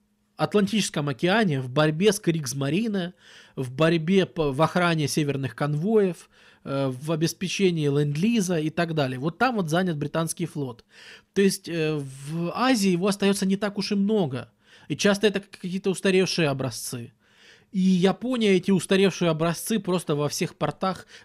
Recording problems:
none

